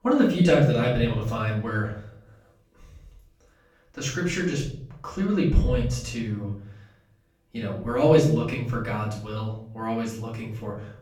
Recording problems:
off-mic speech; far
room echo; noticeable; dies away in 0.6 s

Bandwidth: 18 kHz